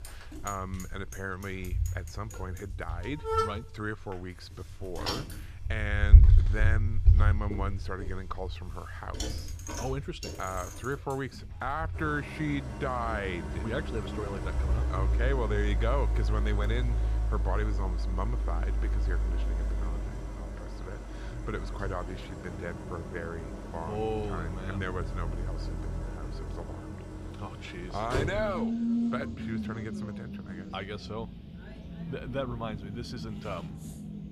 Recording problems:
traffic noise; very loud; throughout; 5 dB above the speech
household noises; faint; throughout; 30 dB below the speech

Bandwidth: 14.5 kHz